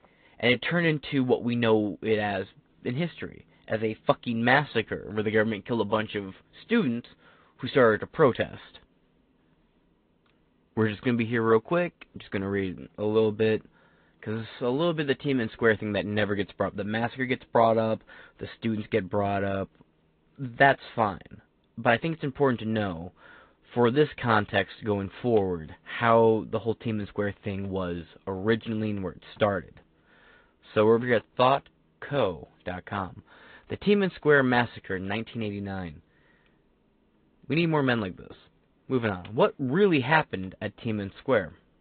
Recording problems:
high frequencies cut off; severe; nothing above 4 kHz
garbled, watery; slightly

